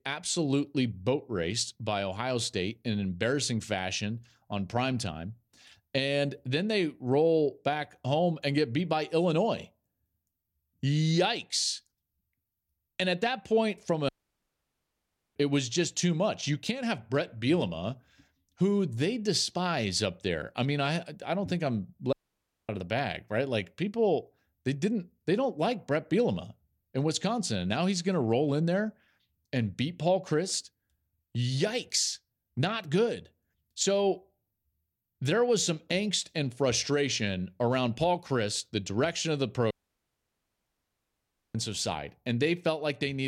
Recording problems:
audio cutting out; at 14 s for 1.5 s, at 22 s for 0.5 s and at 40 s for 2 s
abrupt cut into speech; at the end

